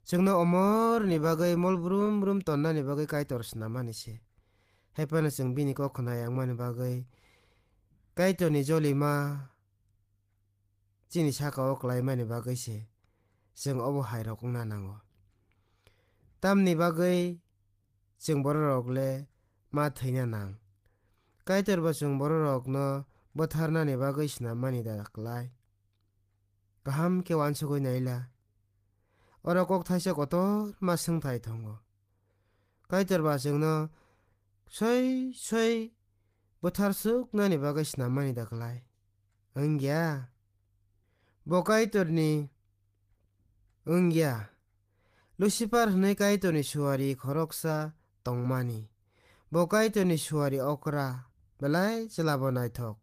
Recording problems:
garbled, watery; slightly; nothing above 15 kHz

